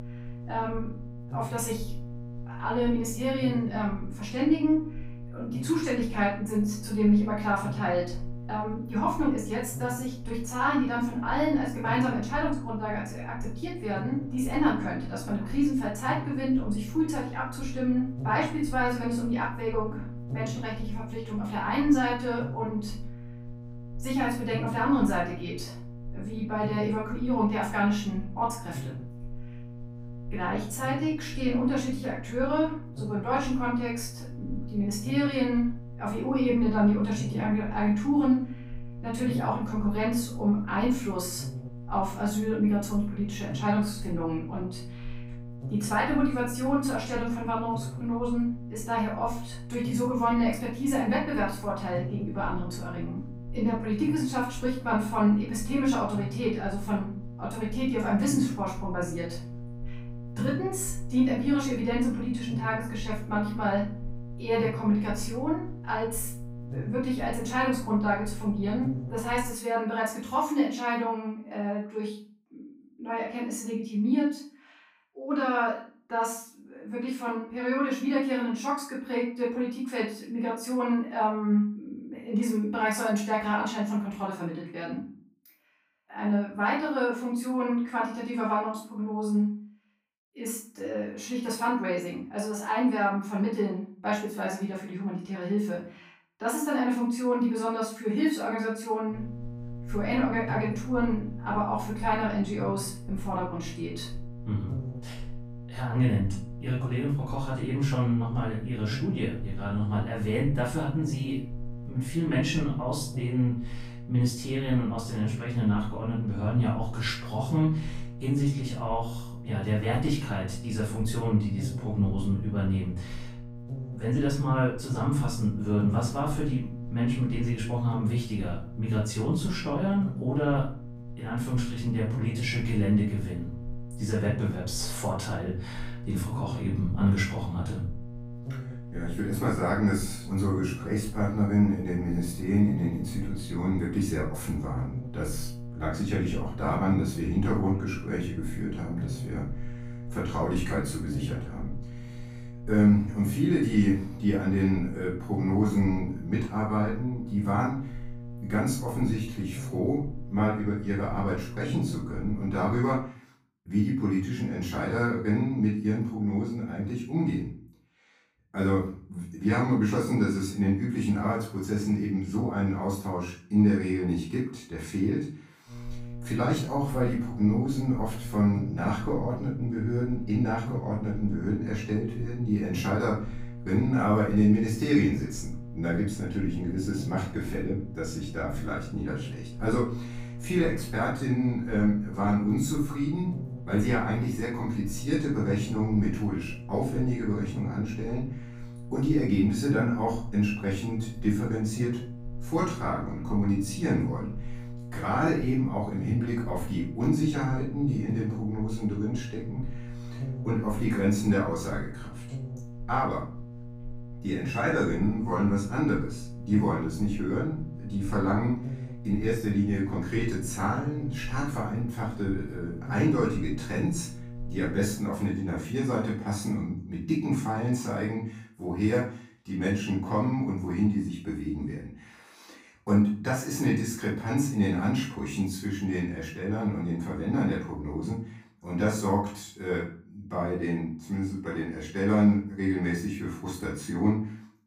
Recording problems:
off-mic speech; far
room echo; noticeable; dies away in 0.4 s
electrical hum; noticeable; until 1:10, from 1:39 to 2:43 and from 2:56 to 3:45; 60 Hz, 15 dB below the speech

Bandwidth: 15.5 kHz